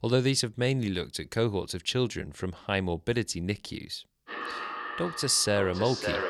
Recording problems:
echo of what is said; strong; from 4.5 s on; 560 ms later, 7 dB below the speech

